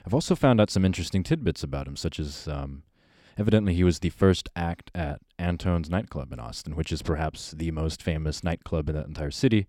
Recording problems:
none

